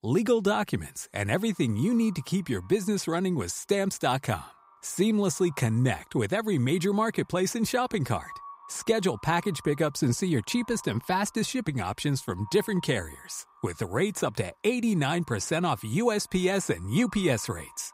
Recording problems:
echo of what is said; faint; throughout; 390 ms later, 25 dB below the speech

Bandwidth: 15.5 kHz